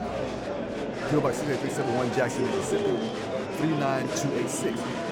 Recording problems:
murmuring crowd; loud; throughout; as loud as the speech

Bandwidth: 18.5 kHz